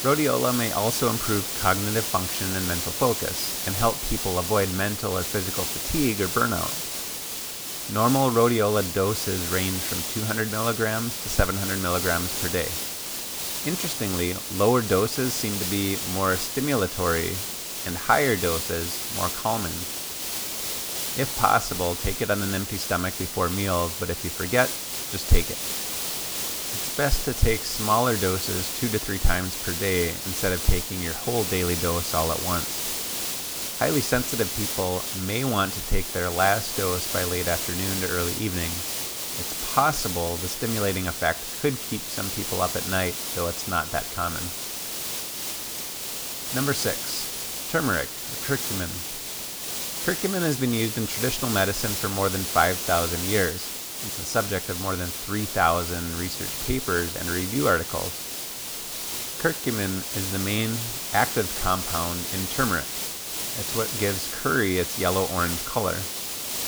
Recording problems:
hiss; loud; throughout; 2 dB below the speech

